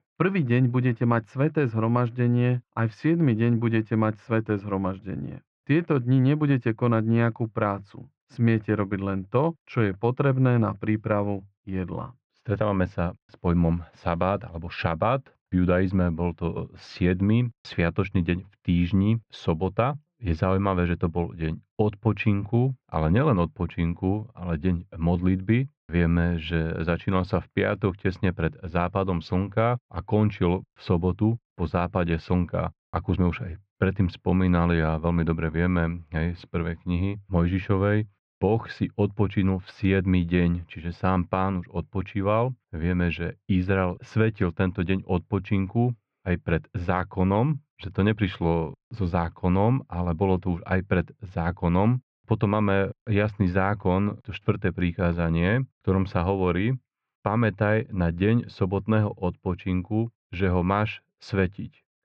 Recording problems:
muffled; slightly; fading above 2 kHz

